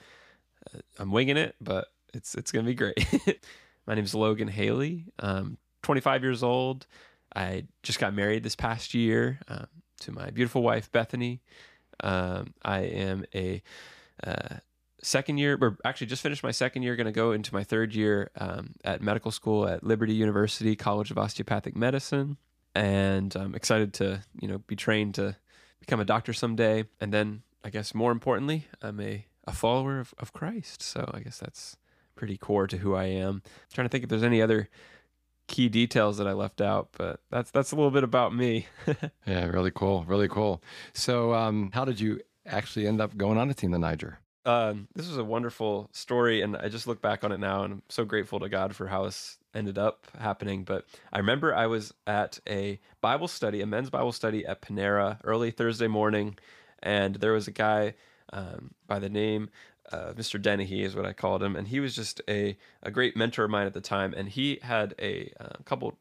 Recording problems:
none

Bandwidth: 15 kHz